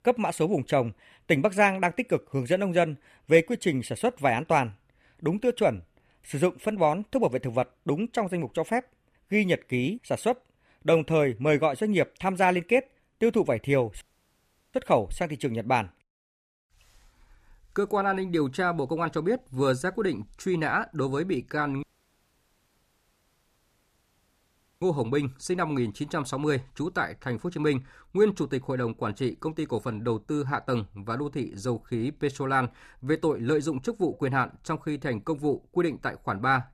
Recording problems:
audio cutting out; at 14 s for 0.5 s and at 22 s for 3 s

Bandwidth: 14.5 kHz